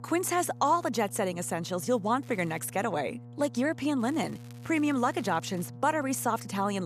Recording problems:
electrical hum; faint; throughout; 60 Hz, 25 dB below the speech
crackling; faint; at 2 s and from 4 to 5.5 s; 25 dB below the speech
abrupt cut into speech; at the end

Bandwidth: 14.5 kHz